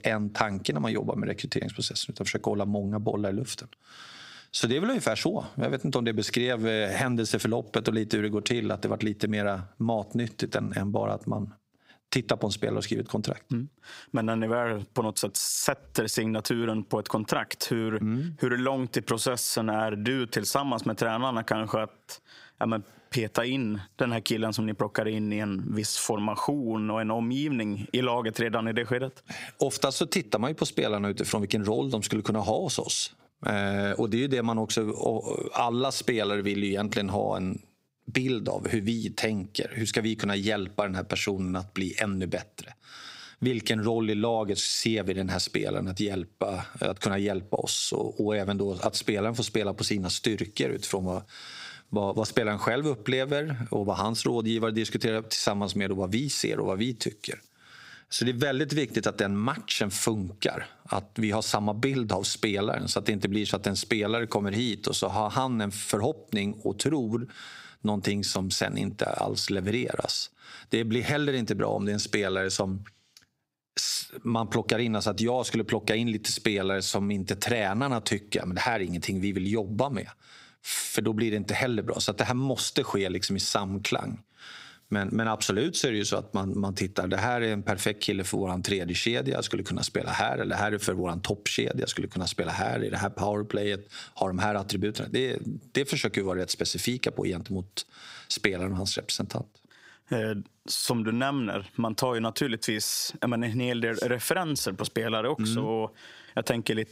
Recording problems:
squashed, flat; heavily

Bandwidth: 15.5 kHz